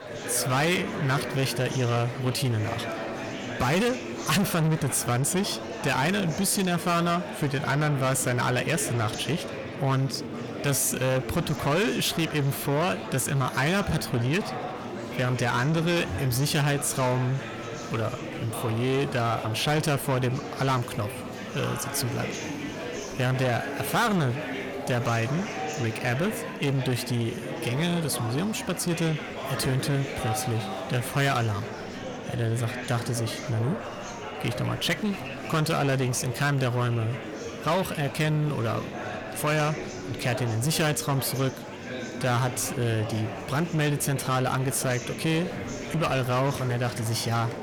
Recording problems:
distortion; heavy; 7 dB below the speech
murmuring crowd; loud; throughout; 8 dB below the speech

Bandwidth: 18.5 kHz